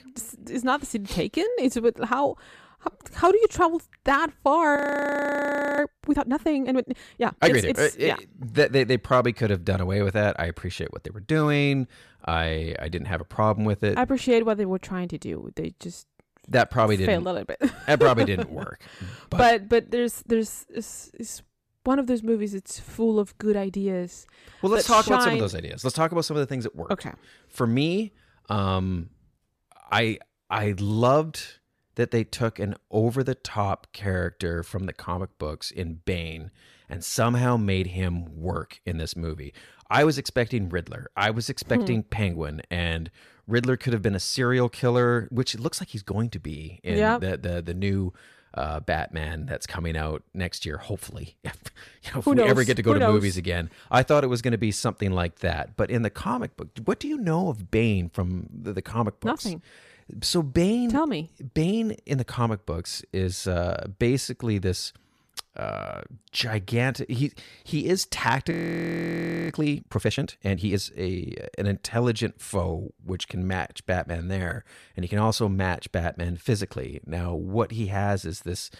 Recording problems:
audio freezing; at 5 s for 1 s and at 1:09 for 1 s

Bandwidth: 14.5 kHz